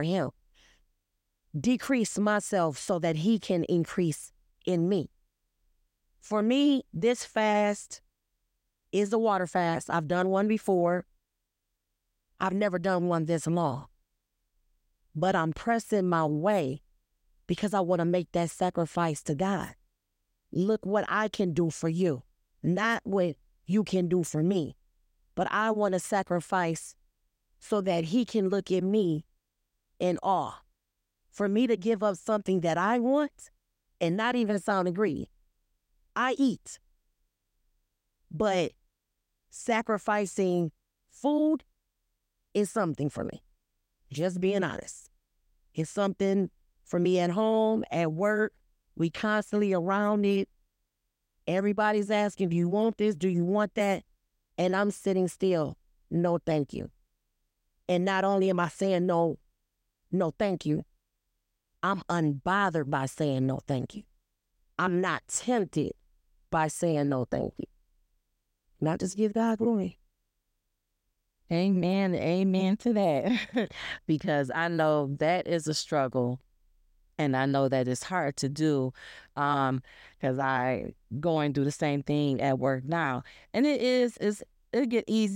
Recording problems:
abrupt cut into speech; at the start and the end

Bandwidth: 16 kHz